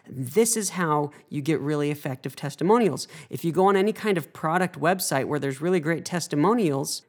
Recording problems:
none

